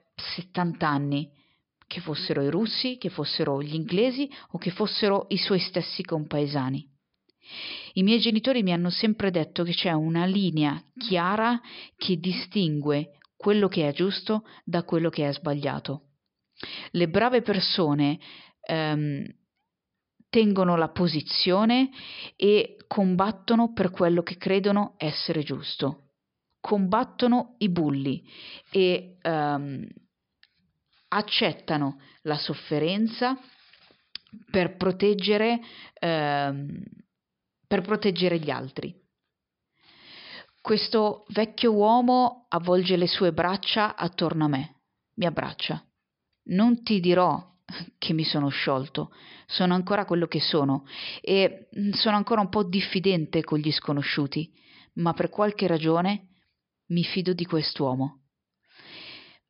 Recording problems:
high frequencies cut off; noticeable; nothing above 5.5 kHz

